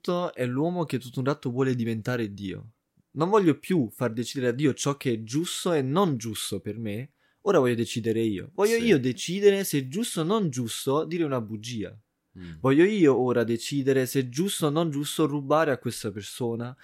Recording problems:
none

